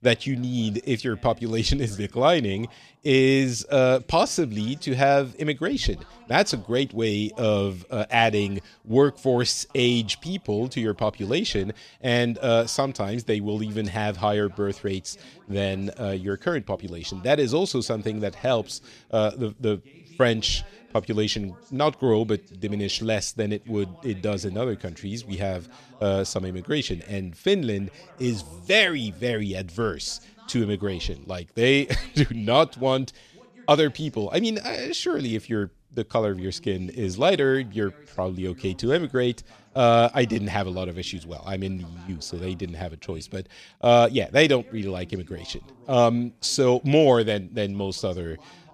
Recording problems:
voice in the background; faint; throughout; 30 dB below the speech

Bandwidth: 14 kHz